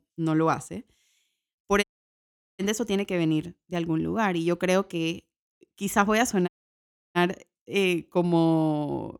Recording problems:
audio cutting out; at 2 s for 0.5 s and at 6.5 s for 0.5 s

